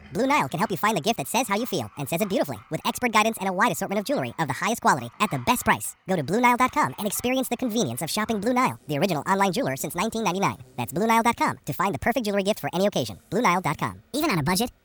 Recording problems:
wrong speed and pitch; too fast and too high; 1.6 times normal speed
animal sounds; faint; throughout; 25 dB below the speech

